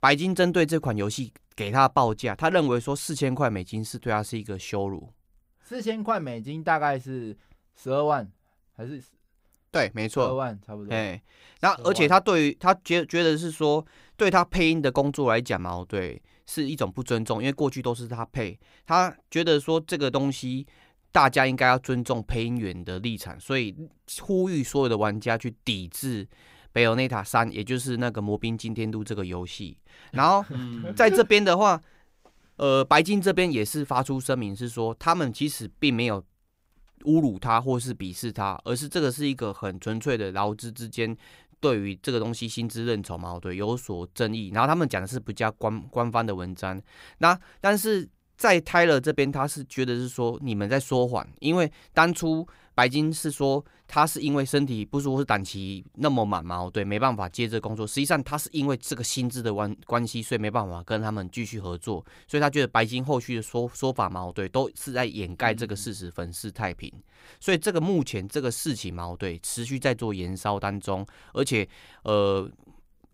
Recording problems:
none

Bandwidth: 15.5 kHz